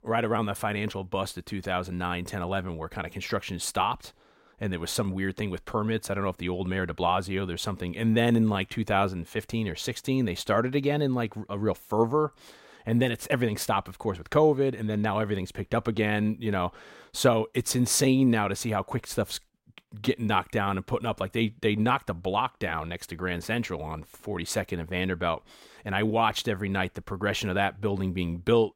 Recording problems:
none

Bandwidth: 16 kHz